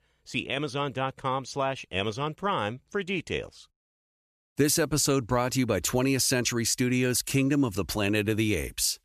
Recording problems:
none

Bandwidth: 14.5 kHz